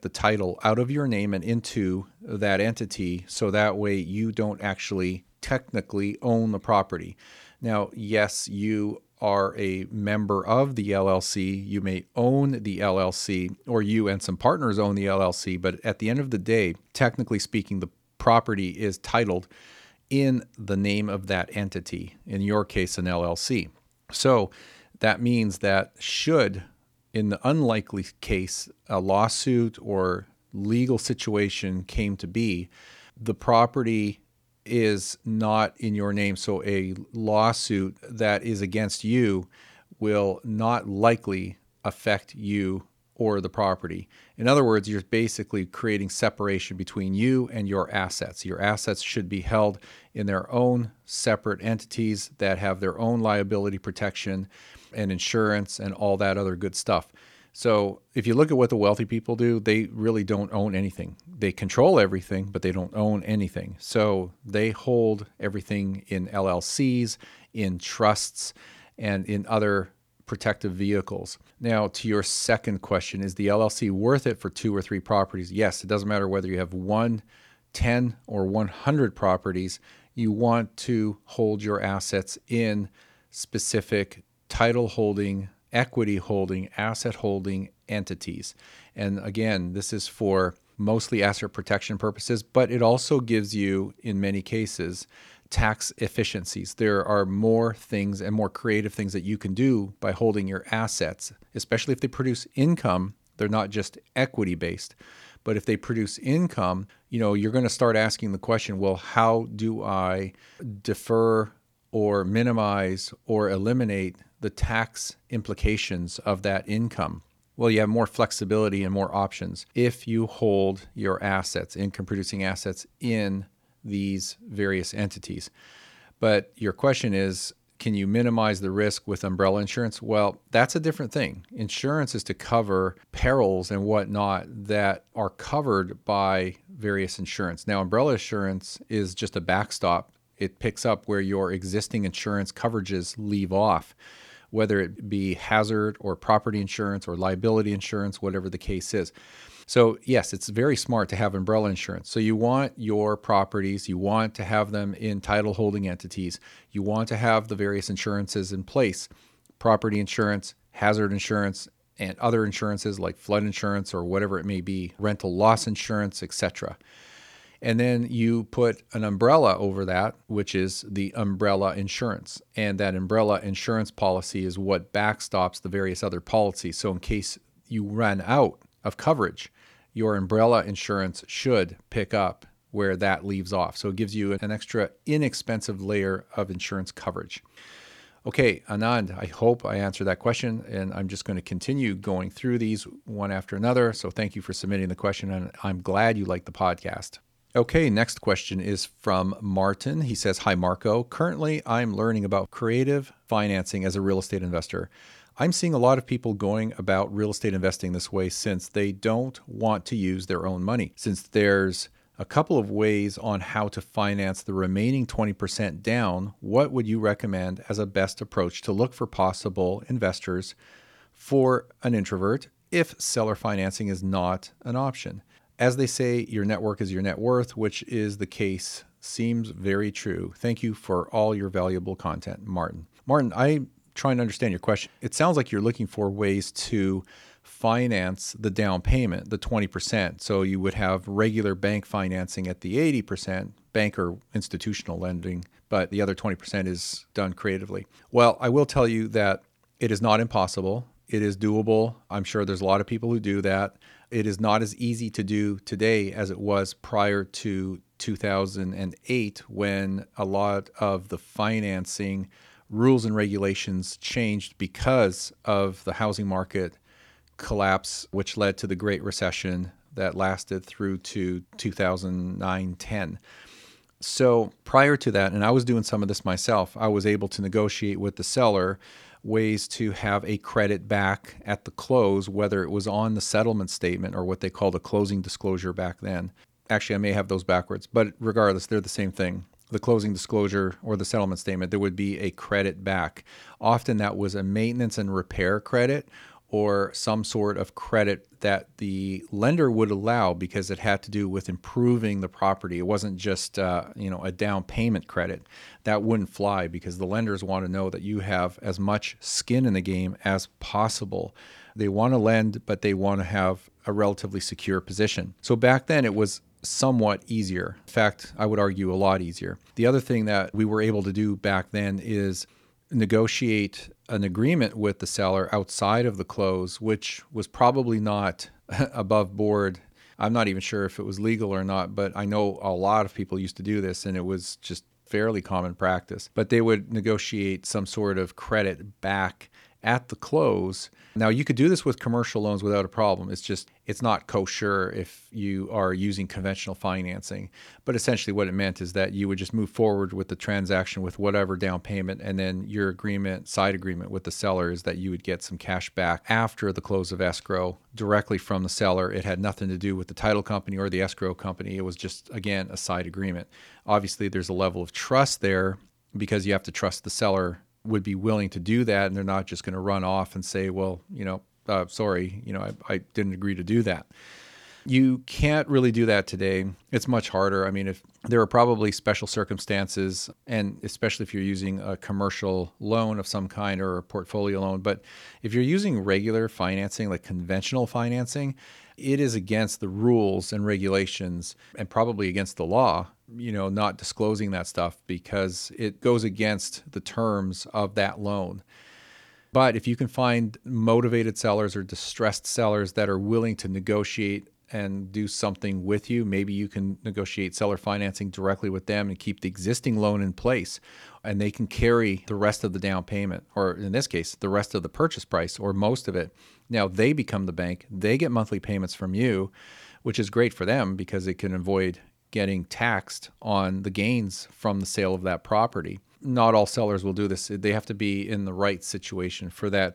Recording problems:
none

